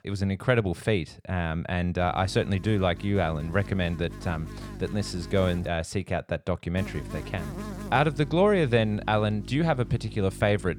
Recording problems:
electrical hum; noticeable; from 2 to 5.5 s and from 7 s on; 50 Hz, 15 dB below the speech

